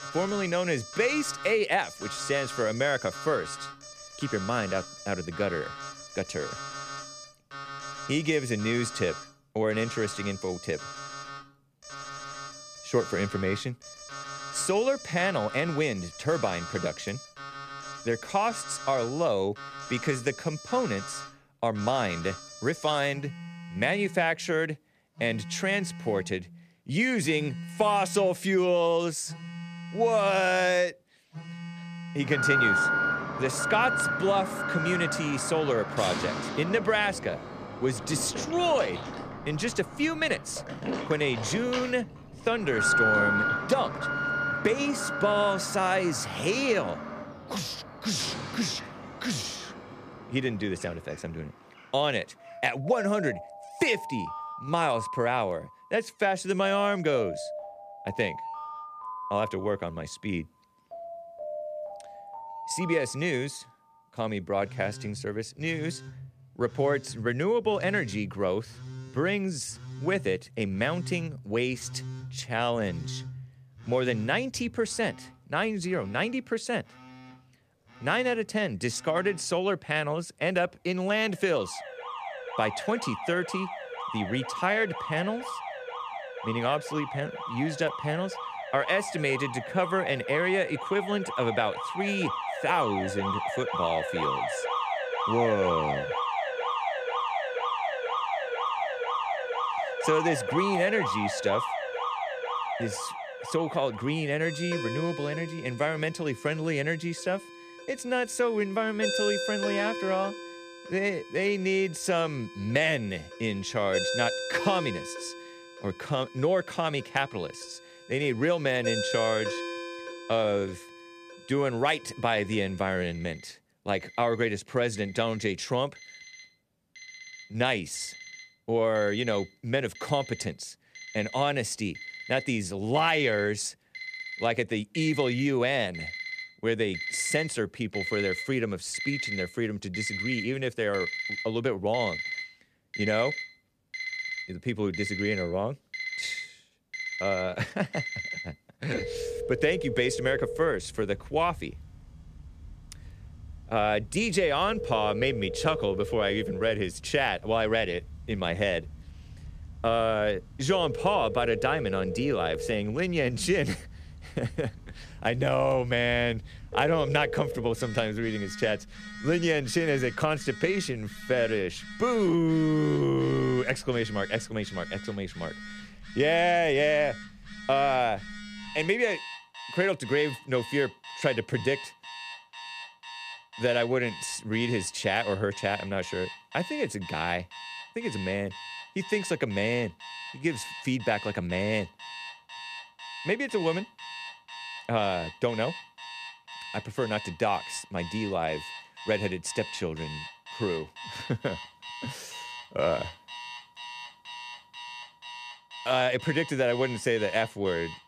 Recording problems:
alarms or sirens; loud; throughout; 7 dB below the speech

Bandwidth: 14.5 kHz